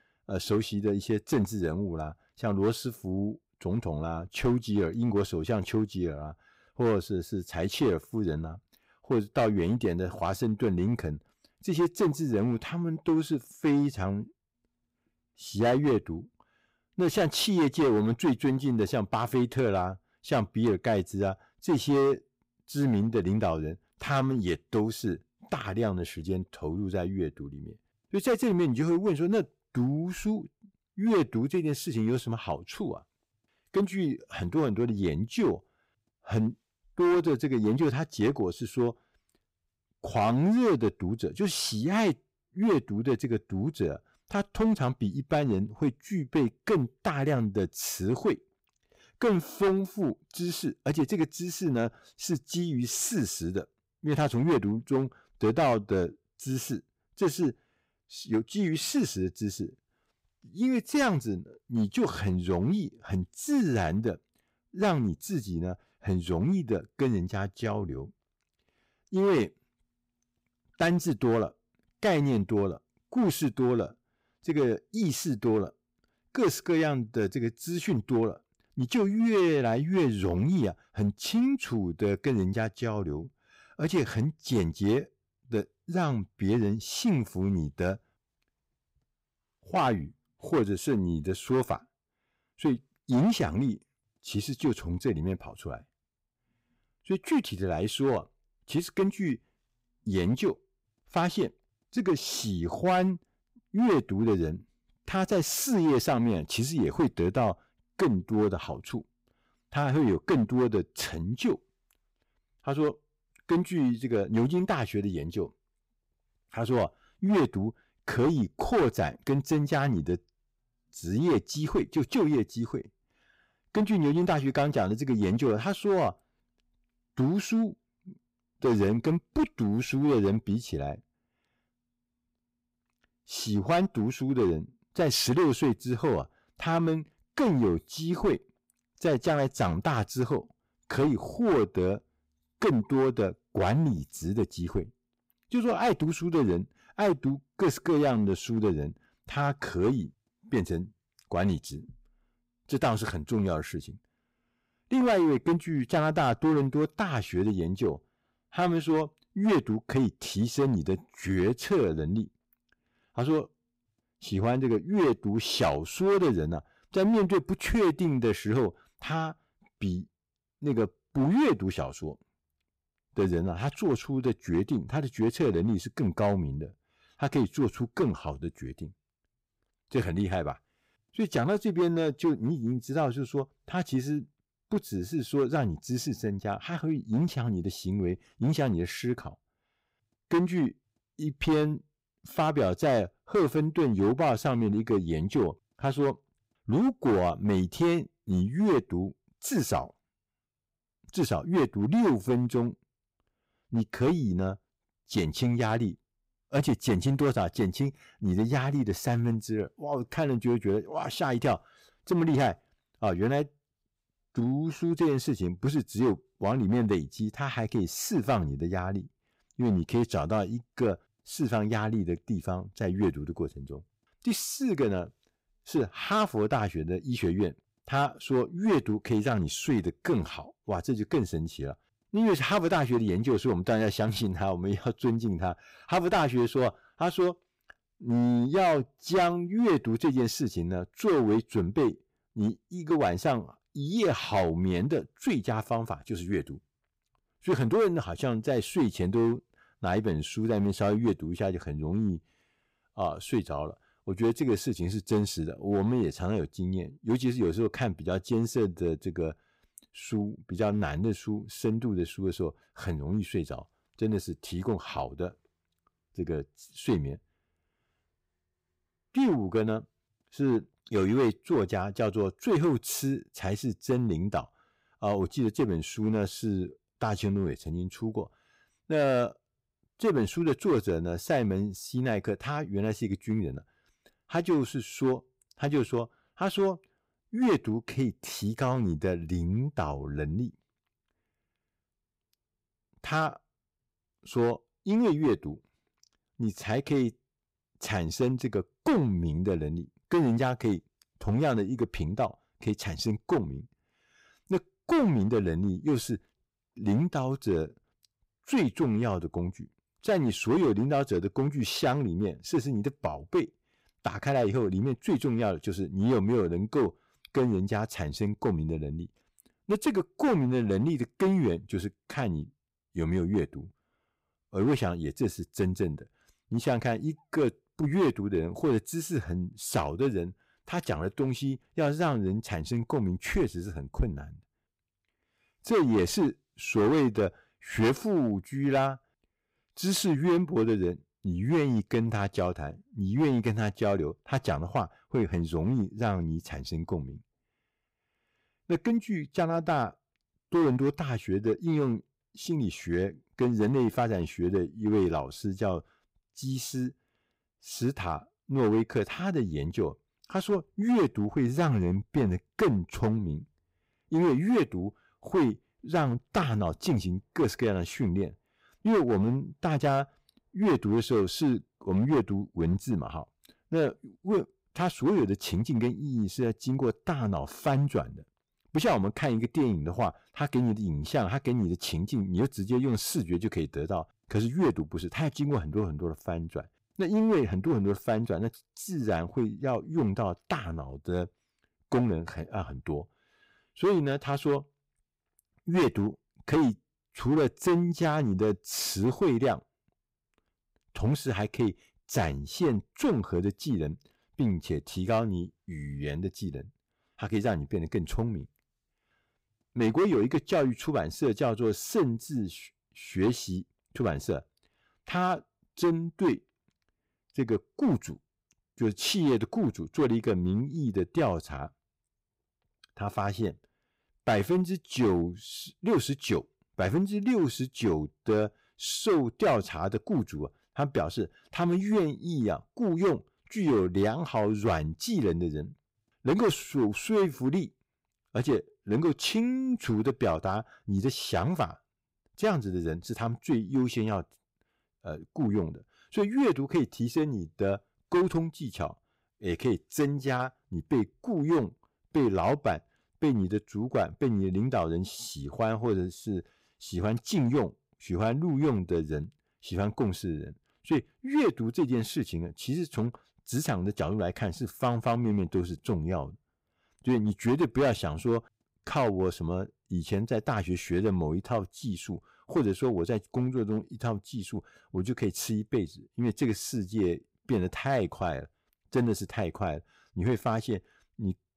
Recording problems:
distortion; slight; 6% of the sound clipped

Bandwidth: 15.5 kHz